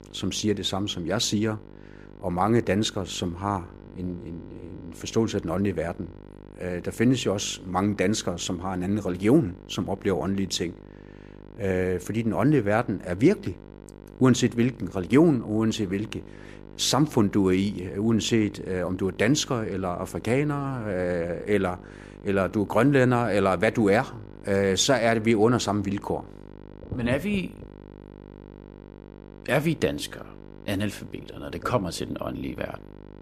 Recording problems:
electrical hum; faint; throughout; 50 Hz, 25 dB below the speech

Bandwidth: 15 kHz